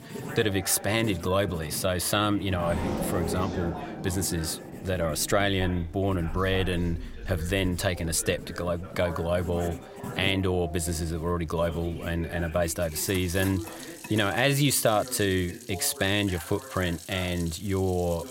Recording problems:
household noises; noticeable; throughout; 15 dB below the speech
traffic noise; noticeable; until 14 s; 10 dB below the speech
voice in the background; noticeable; throughout; 15 dB below the speech

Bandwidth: 16 kHz